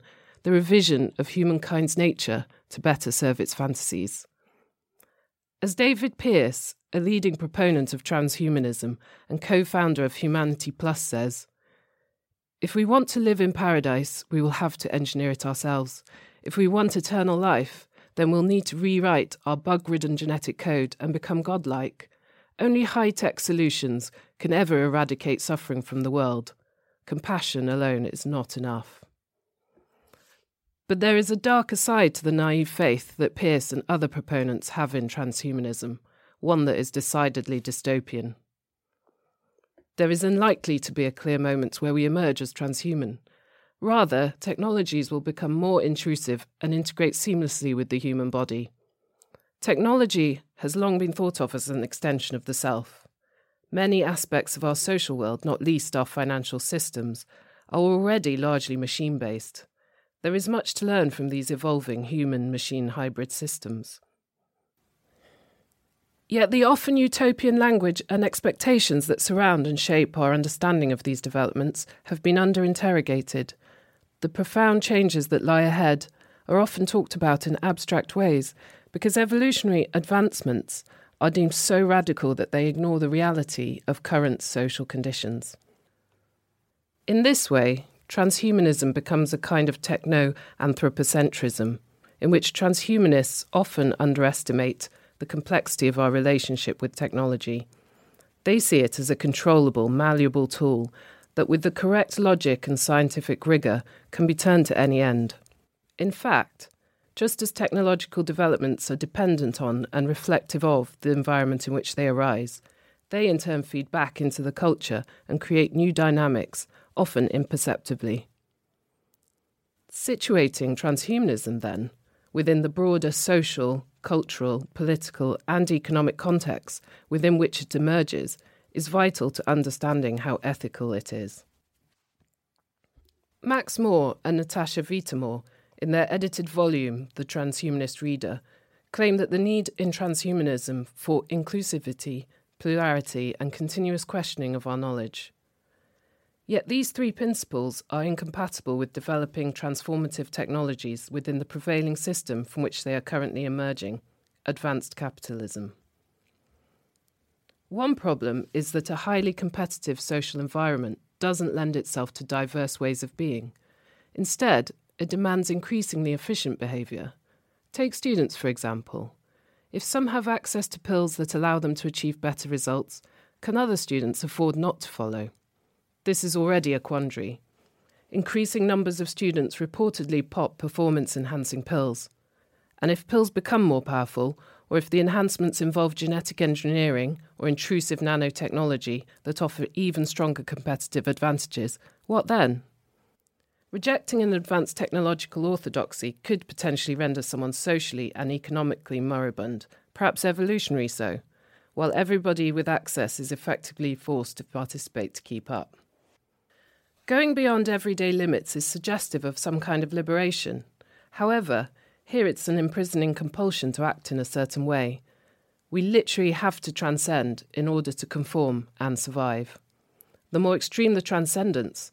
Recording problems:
none

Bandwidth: 16 kHz